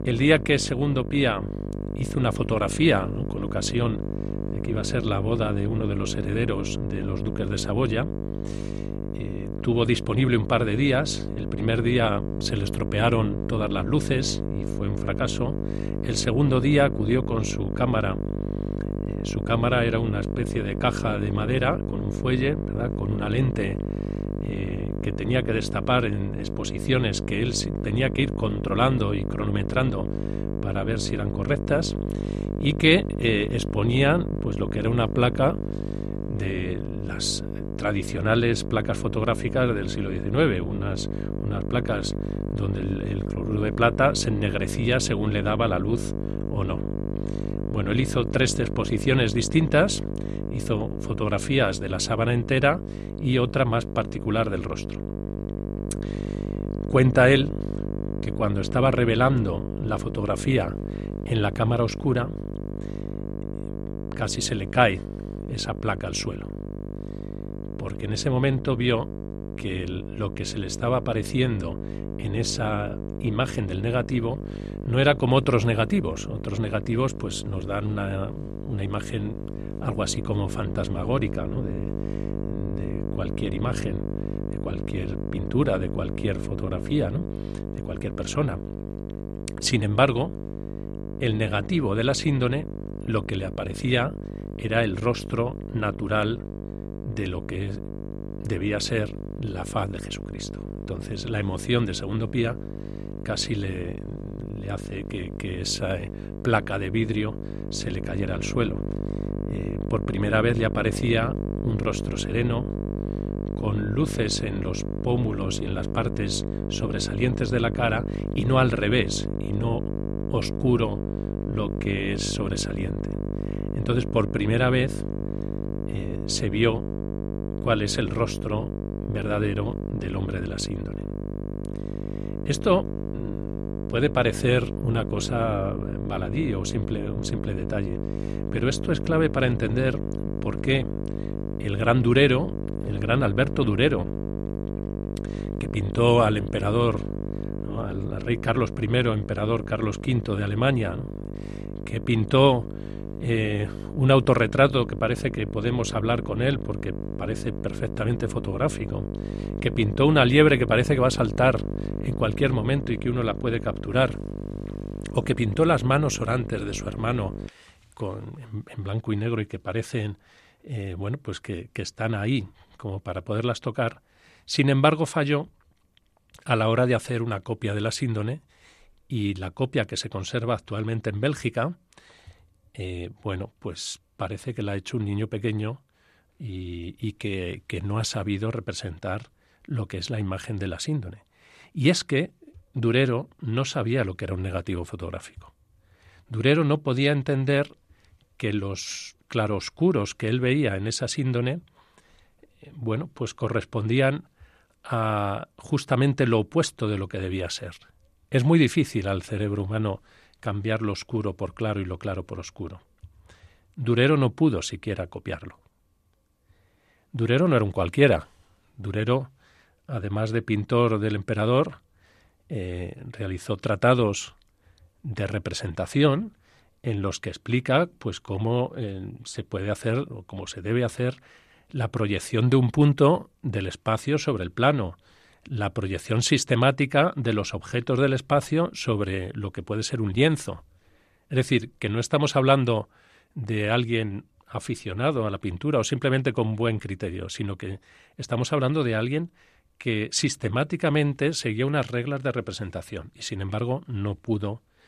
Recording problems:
electrical hum; noticeable; until 2:47; 50 Hz, 10 dB below the speech

